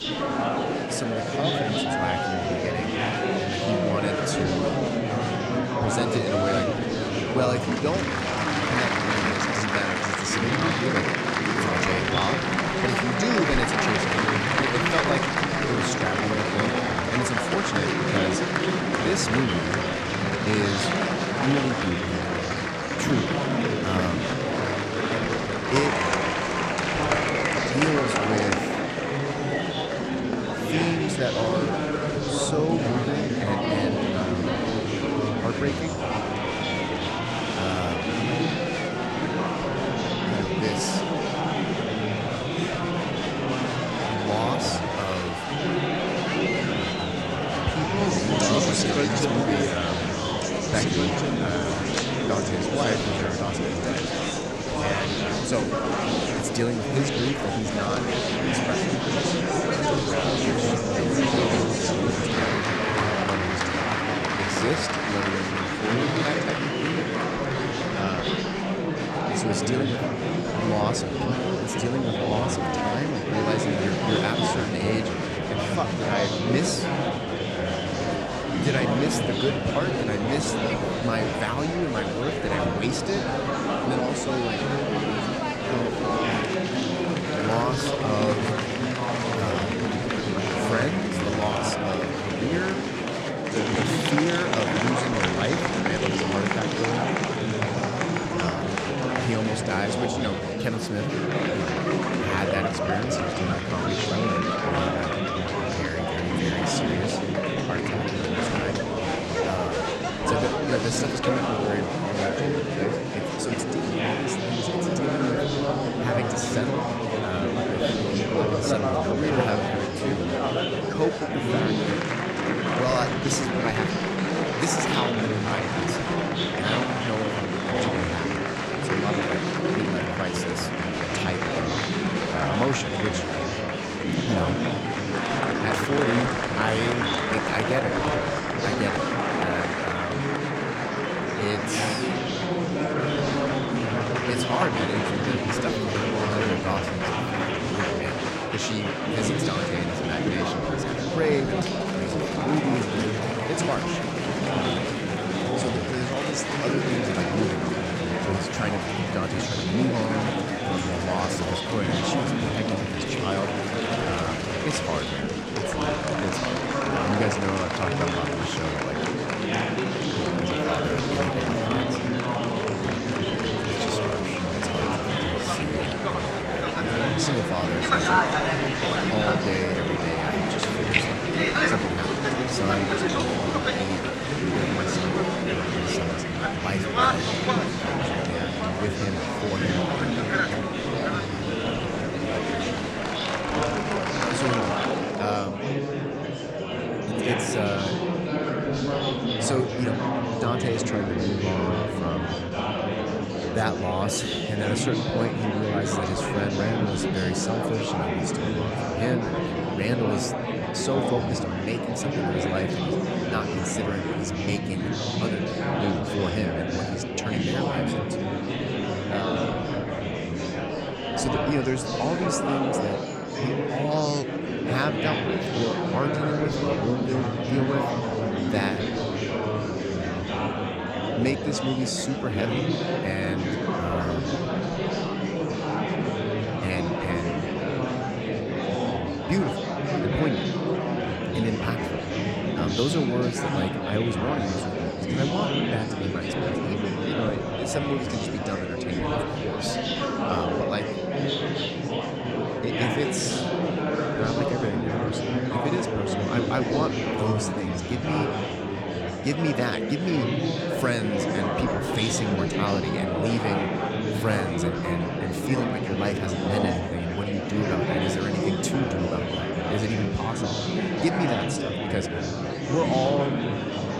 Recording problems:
murmuring crowd; very loud; throughout; 4 dB above the speech

